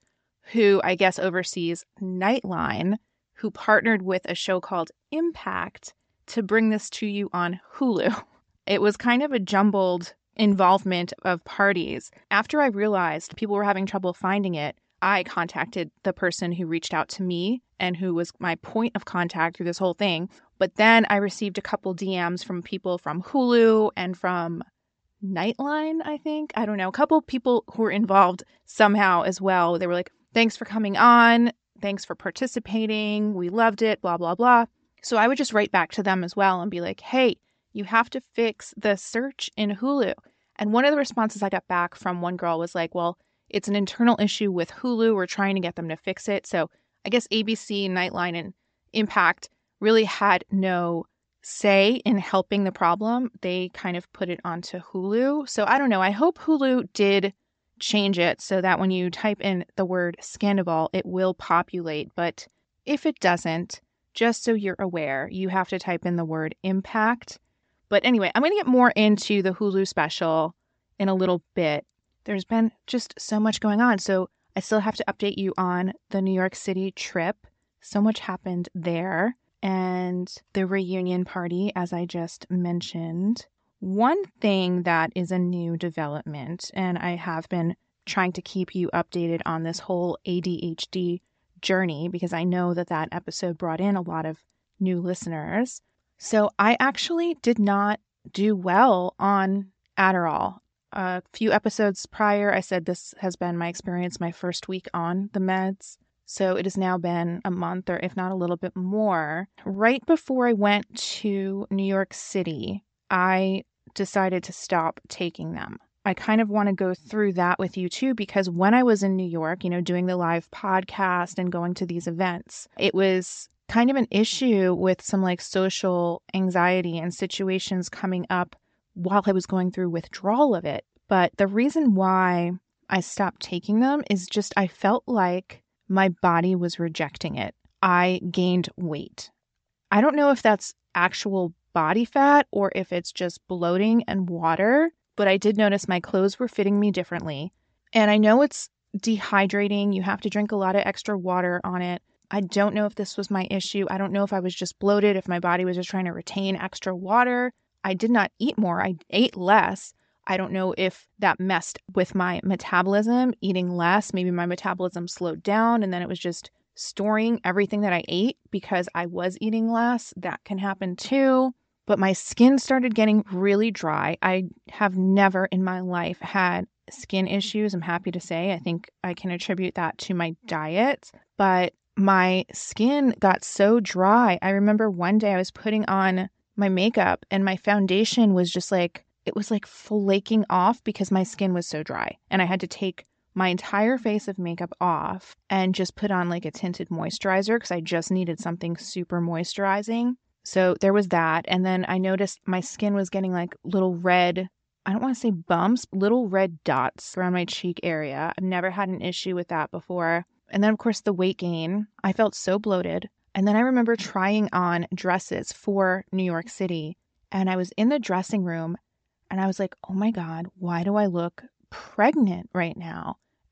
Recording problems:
high frequencies cut off; noticeable; nothing above 8 kHz

